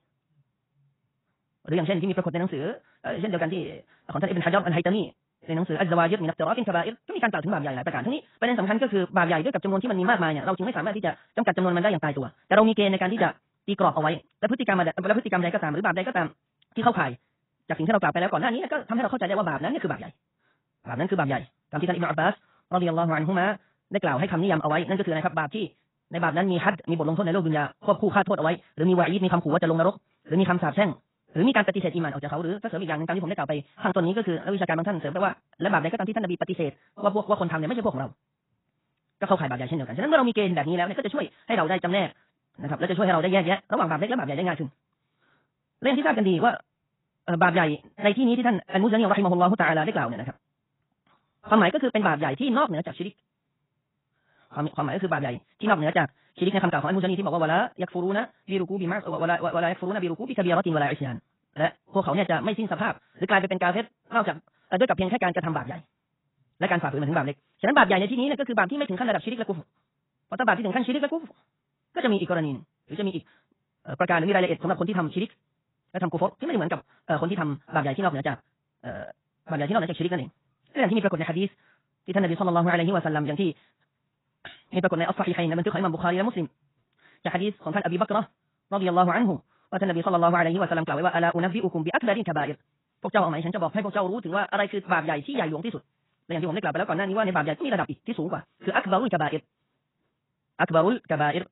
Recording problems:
garbled, watery; badly; nothing above 4 kHz
wrong speed, natural pitch; too fast; 1.7 times normal speed

